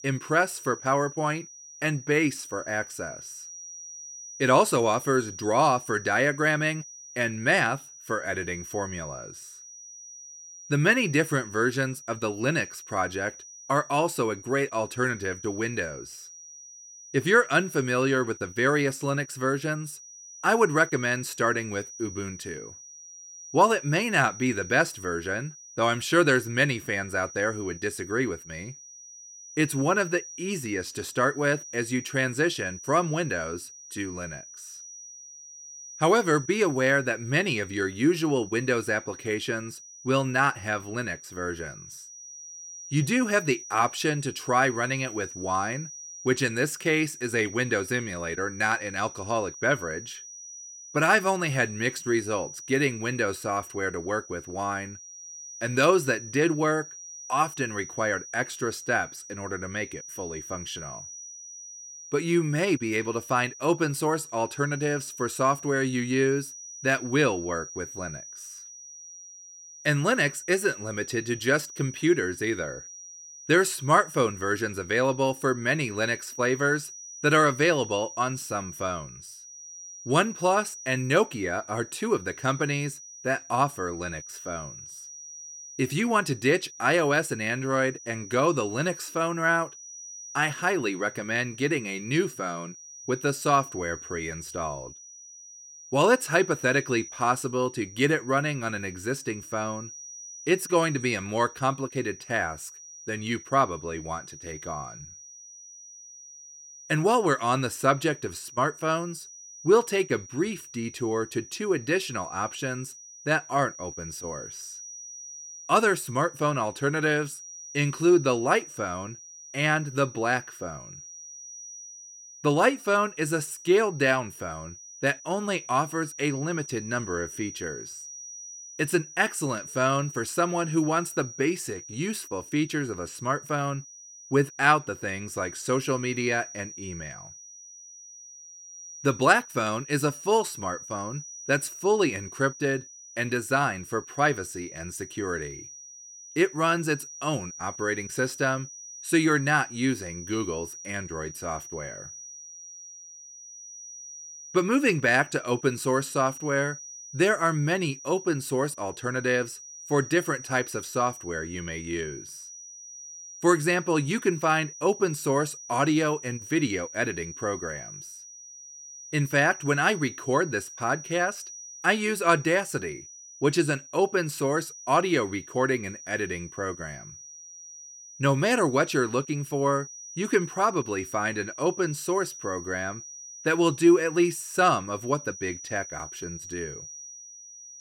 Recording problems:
high-pitched whine; noticeable; throughout; 6 kHz, 15 dB below the speech

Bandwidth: 16.5 kHz